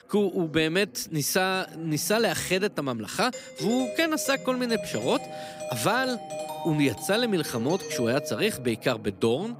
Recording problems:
background chatter; faint; throughout; 3 voices, 20 dB below the speech
doorbell; noticeable; from 3.5 to 8.5 s; peak 7 dB below the speech

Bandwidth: 15.5 kHz